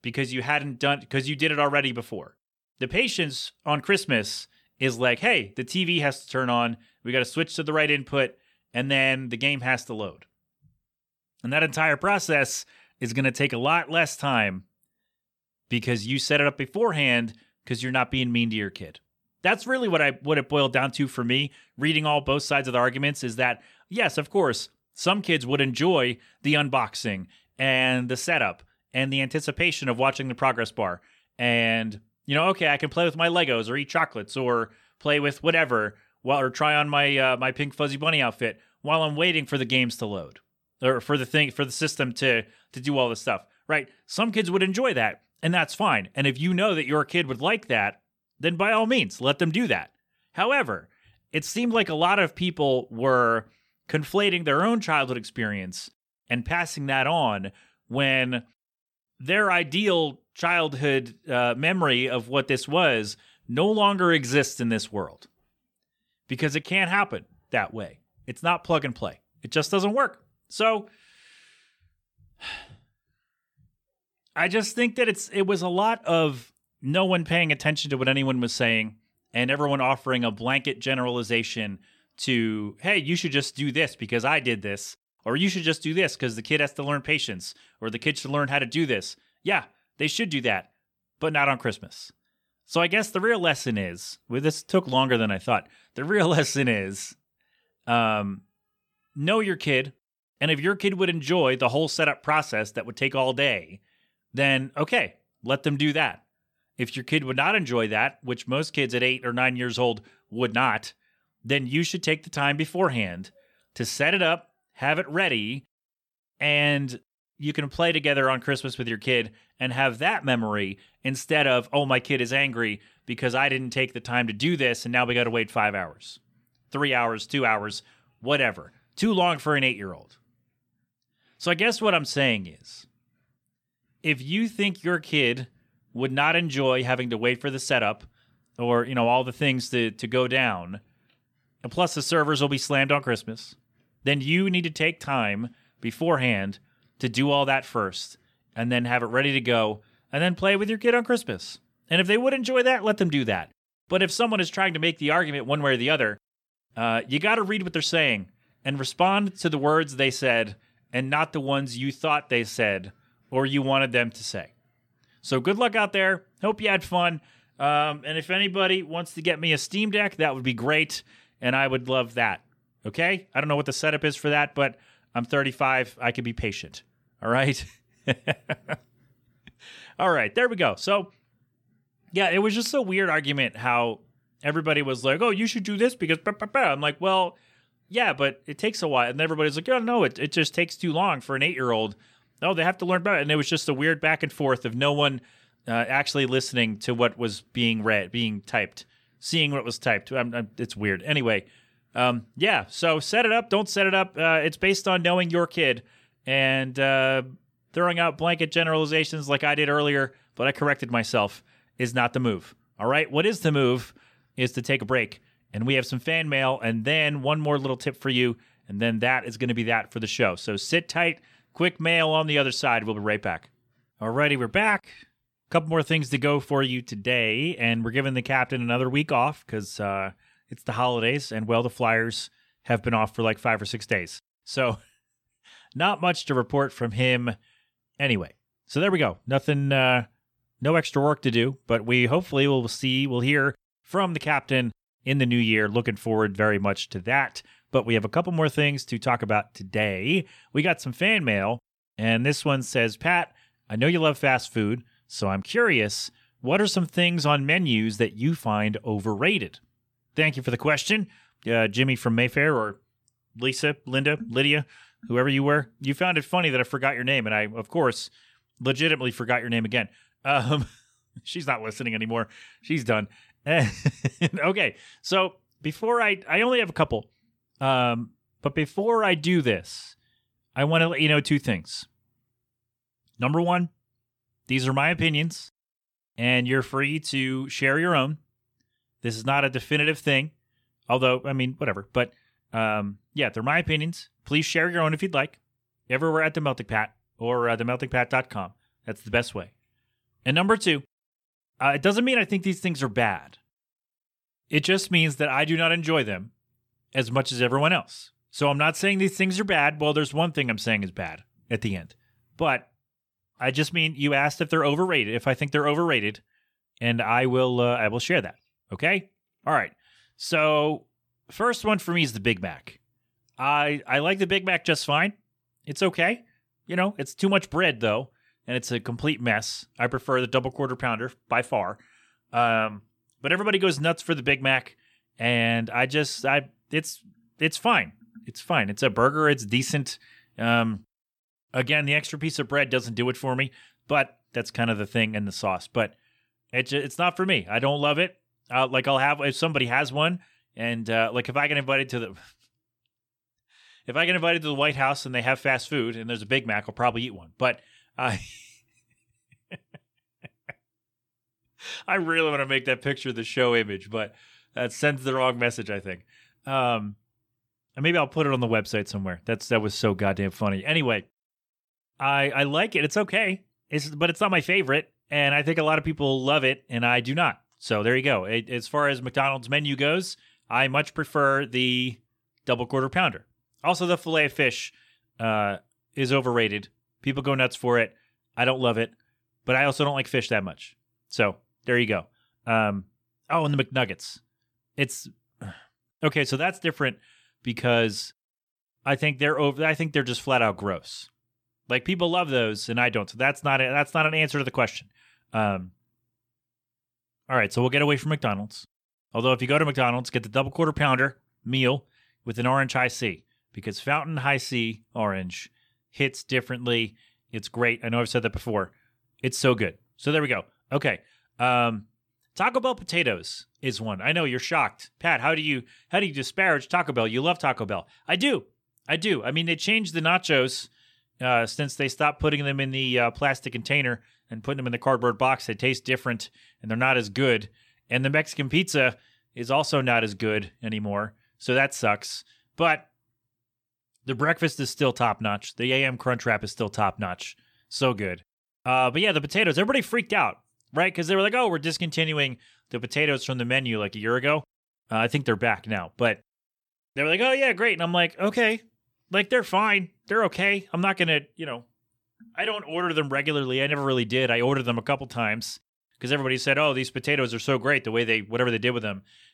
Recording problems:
none

